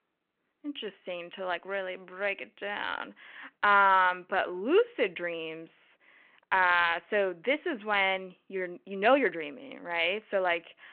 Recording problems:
muffled; very; fading above 2.5 kHz
thin; somewhat; fading below 850 Hz
phone-call audio
uneven, jittery; strongly; from 0.5 to 9.5 s

